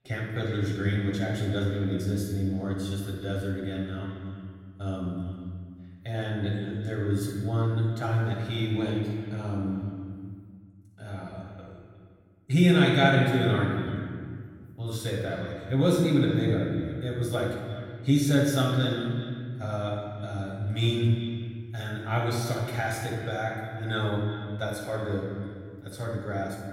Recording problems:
off-mic speech; far
room echo; noticeable; dies away in 1.7 s
echo of what is said; faint; throughout; 360 ms later, 20 dB below the speech

